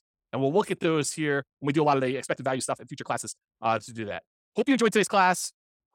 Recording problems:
uneven, jittery; strongly; from 1 to 5 s

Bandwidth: 17 kHz